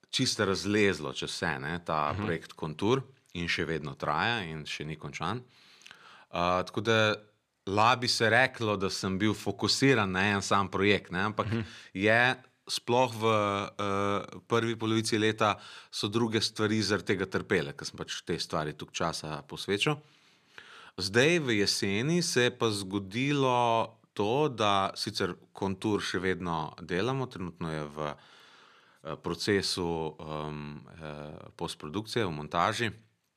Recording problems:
none

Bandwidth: 14.5 kHz